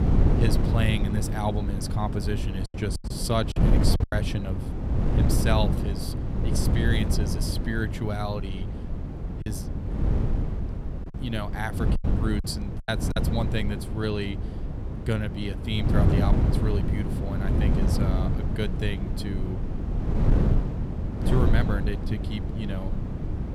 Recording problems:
wind noise on the microphone; heavy; 3 dB below the speech
choppy; very; from 2.5 to 4 s and from 12 to 13 s; 14% of the speech affected

